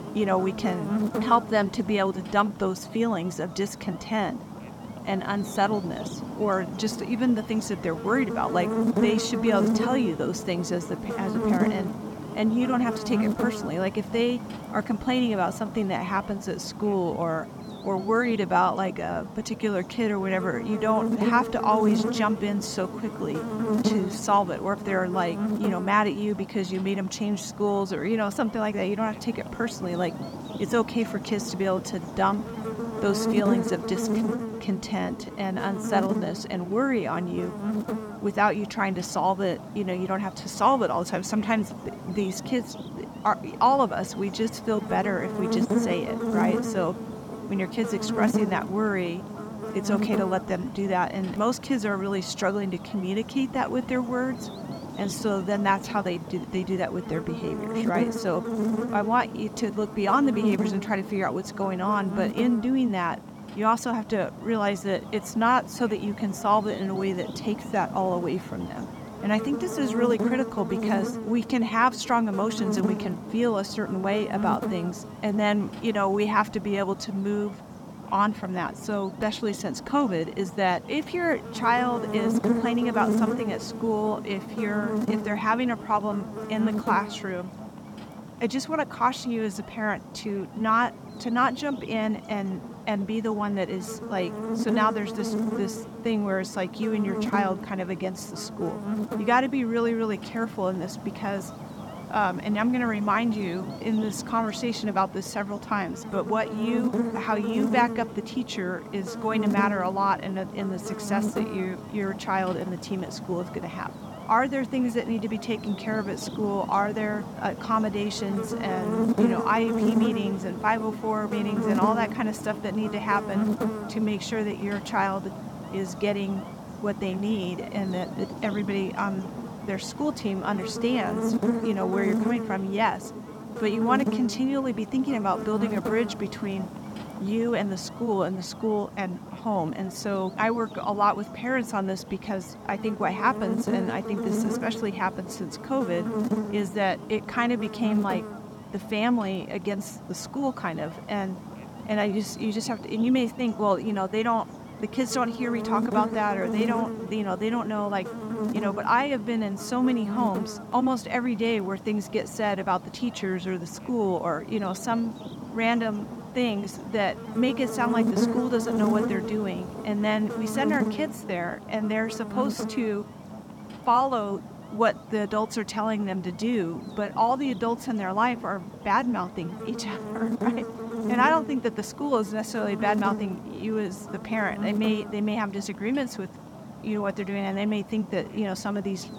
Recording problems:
electrical hum; loud; throughout; 50 Hz, 9 dB below the speech

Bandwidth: 17.5 kHz